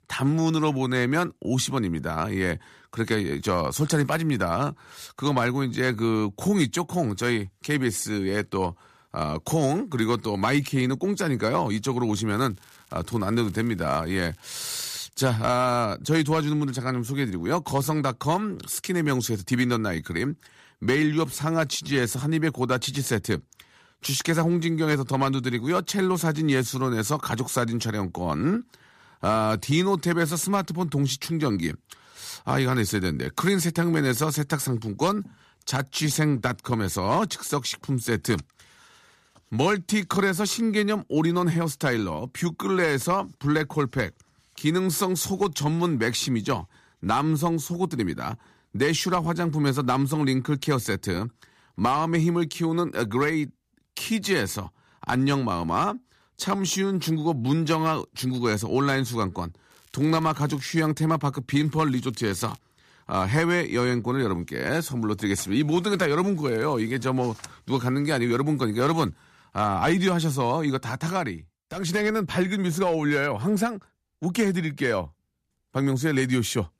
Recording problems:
crackling; faint; 4 times, first at 12 s; 30 dB below the speech

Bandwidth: 14.5 kHz